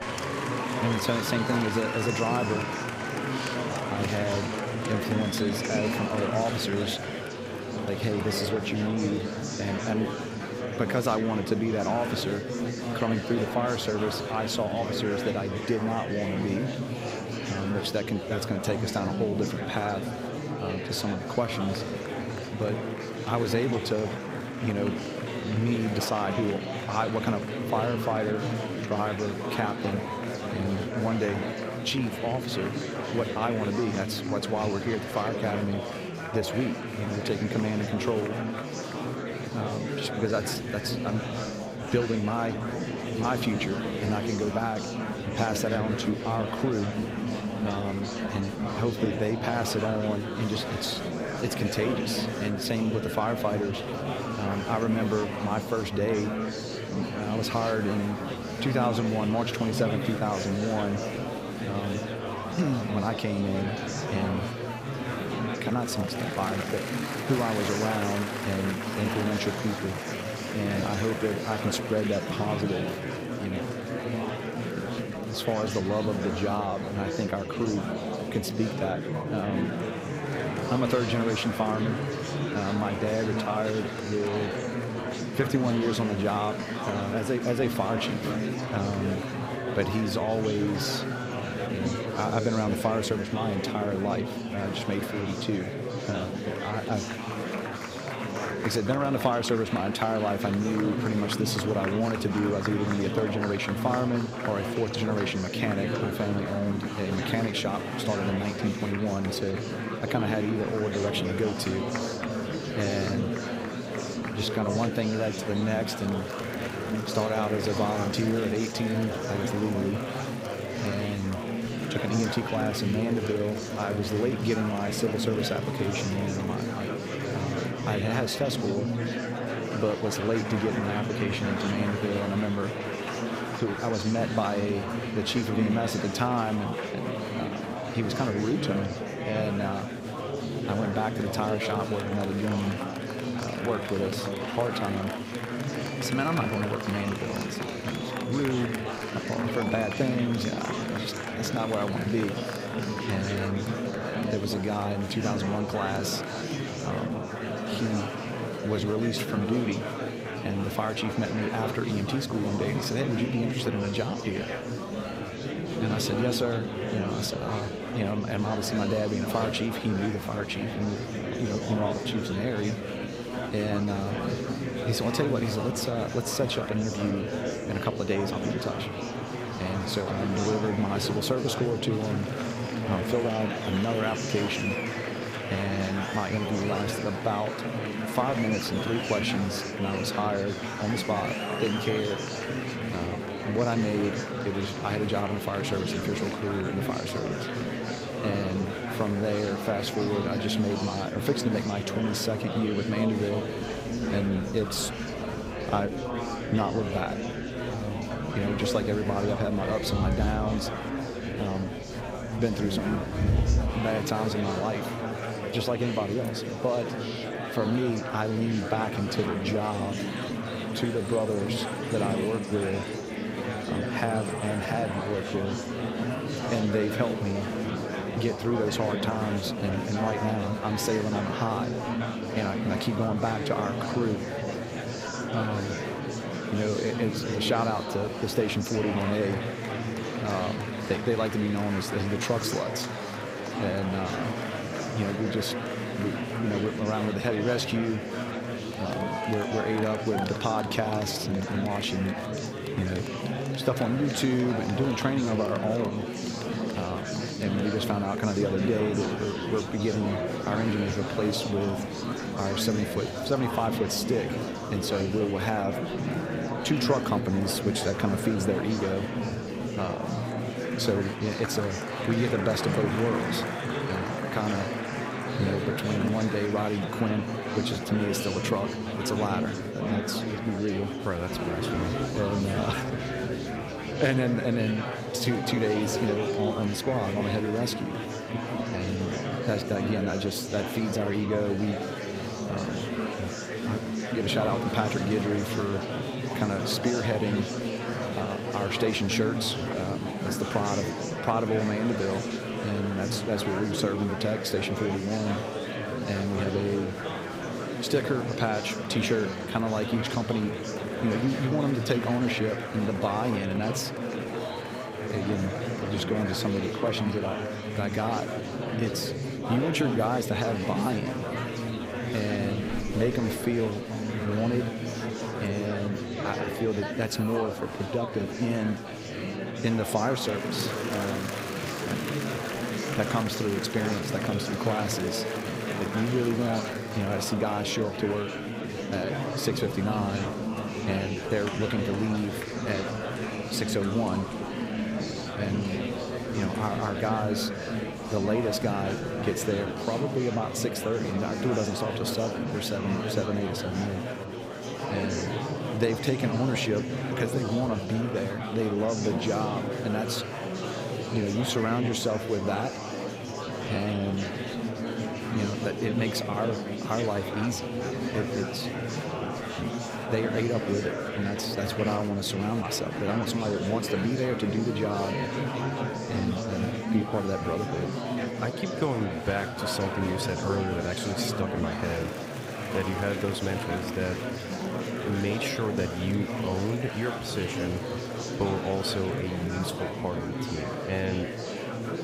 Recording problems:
murmuring crowd; loud; throughout; 2 dB below the speech

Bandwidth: 15.5 kHz